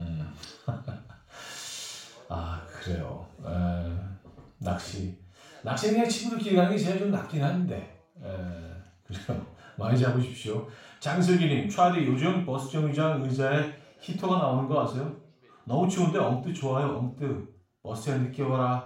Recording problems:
off-mic speech; far
room echo; noticeable; dies away in 0.4 s
voice in the background; faint; throughout; 30 dB below the speech
abrupt cut into speech; at the start

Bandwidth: 16 kHz